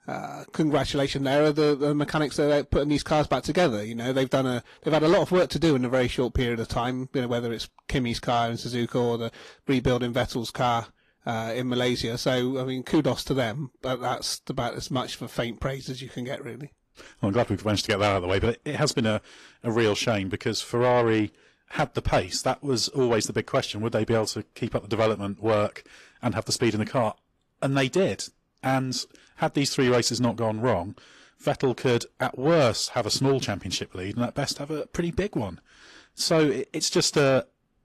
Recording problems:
distortion; slight; 10 dB below the speech
garbled, watery; slightly; nothing above 14 kHz

